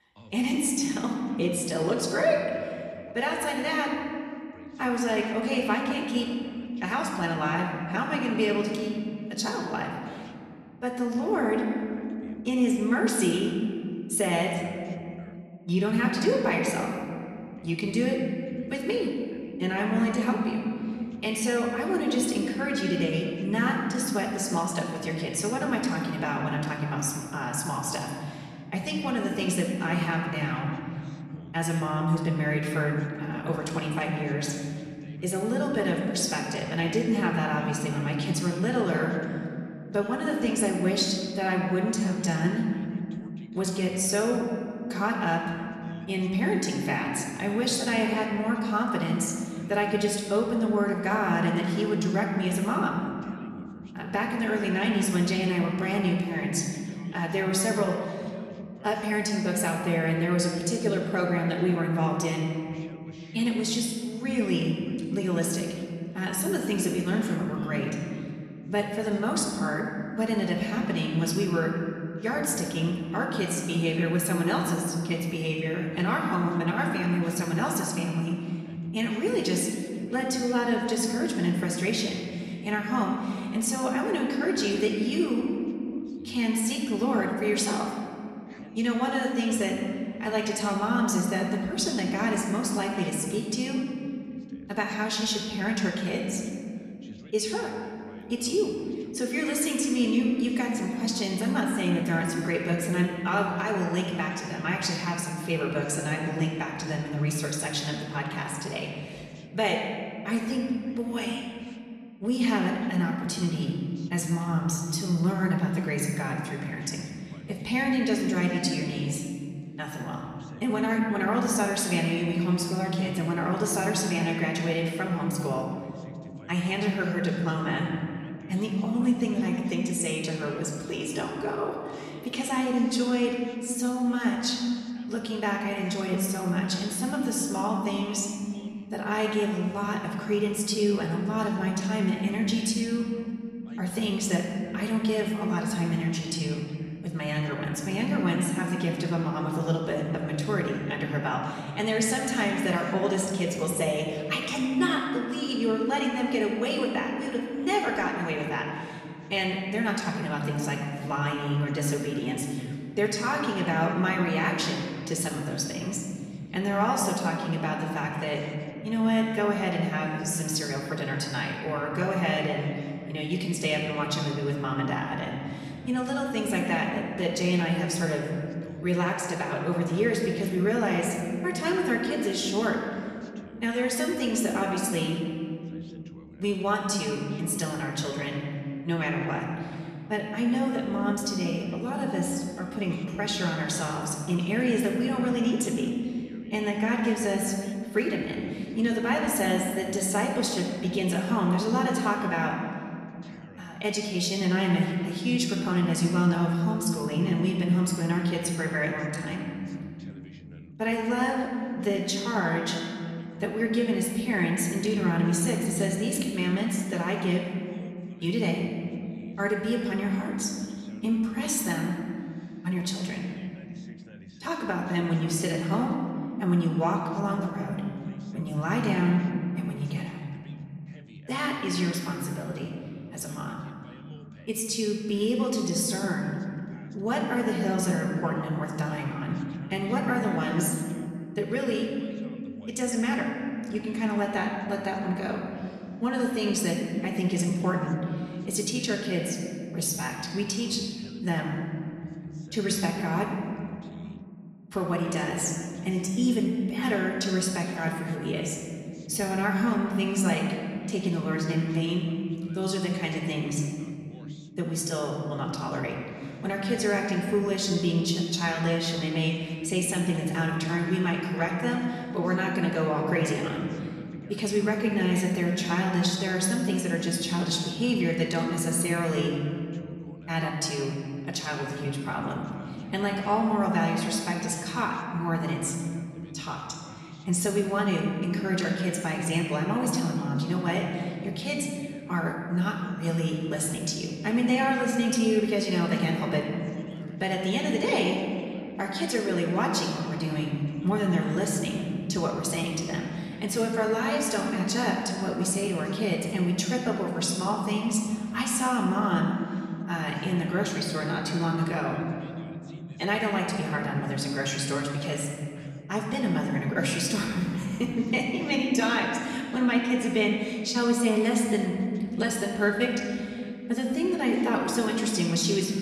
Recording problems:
off-mic speech; far
room echo; noticeable; dies away in 3 s
voice in the background; faint; throughout; 25 dB below the speech

